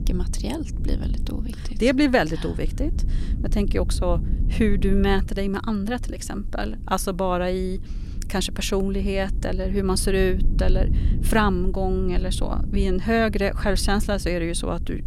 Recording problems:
low rumble; noticeable; throughout; 20 dB below the speech

